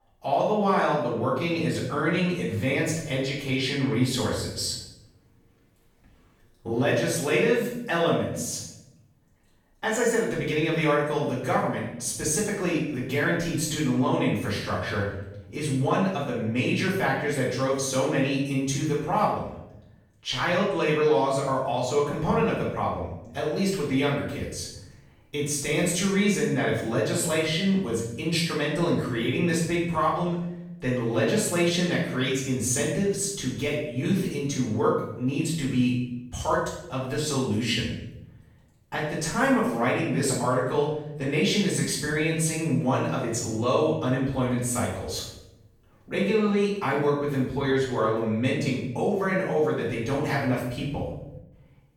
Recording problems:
off-mic speech; far
room echo; noticeable; dies away in 0.8 s

